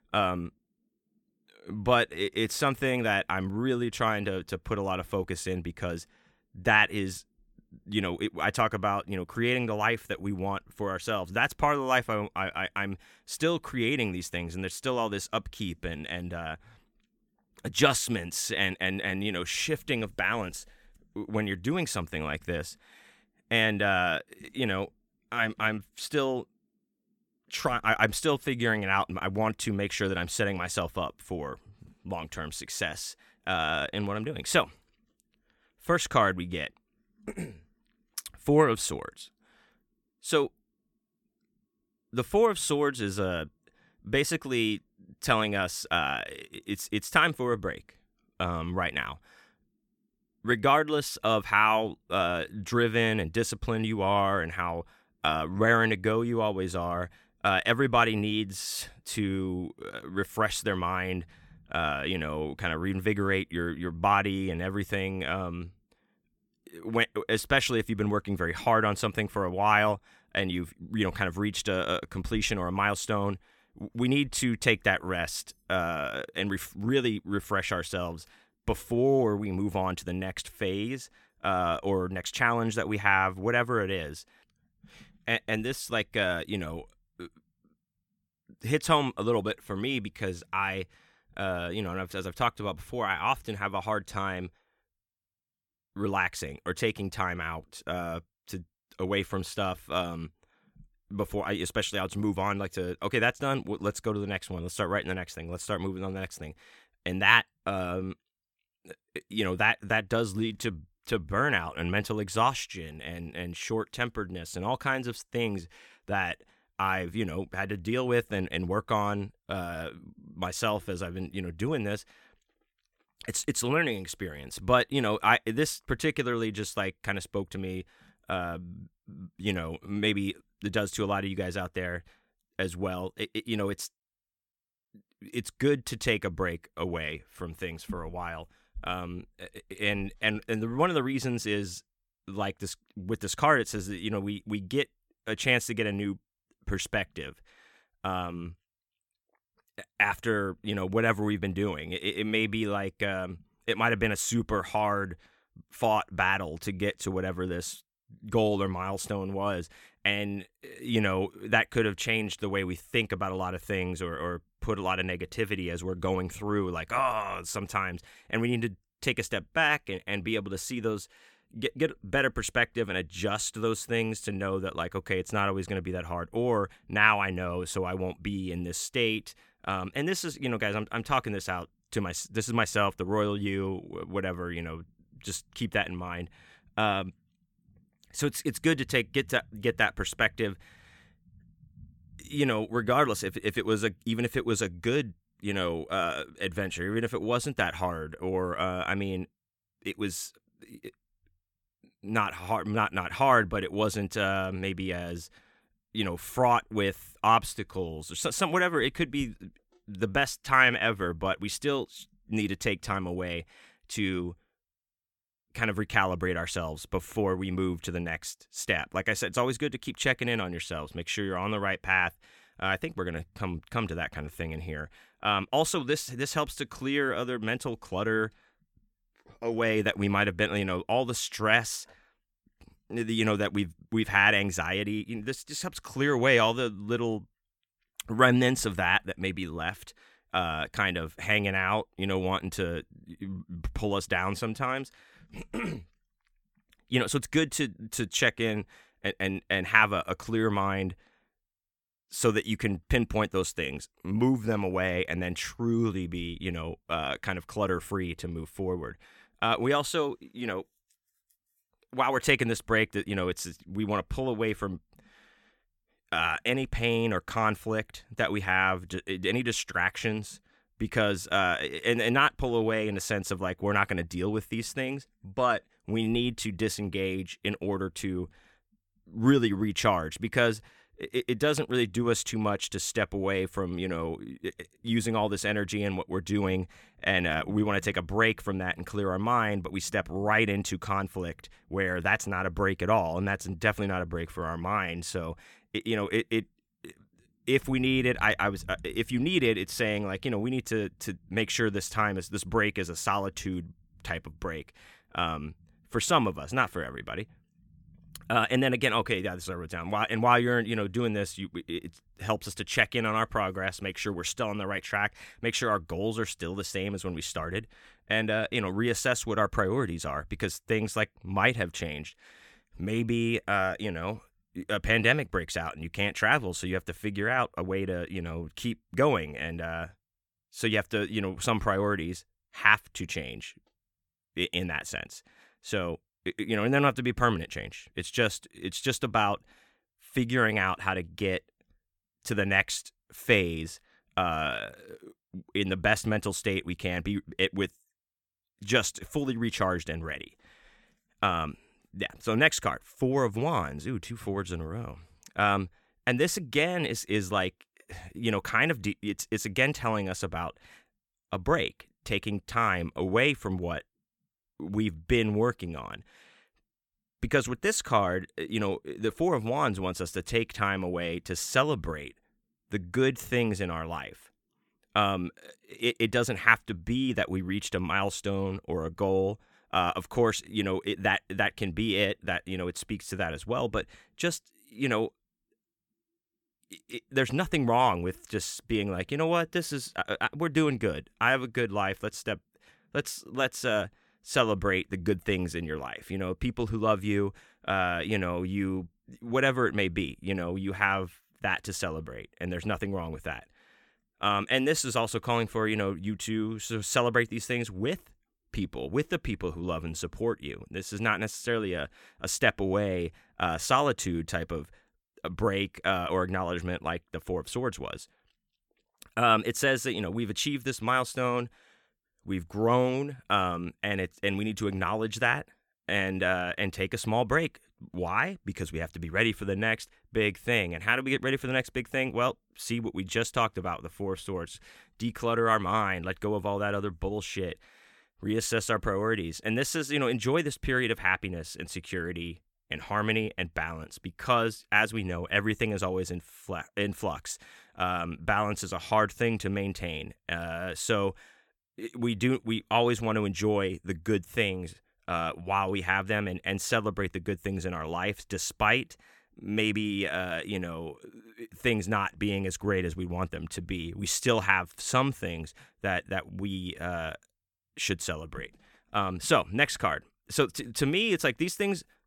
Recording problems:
none

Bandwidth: 17 kHz